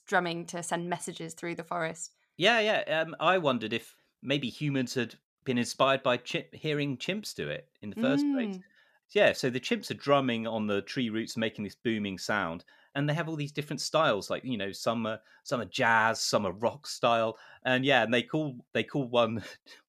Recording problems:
none

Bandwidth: 14.5 kHz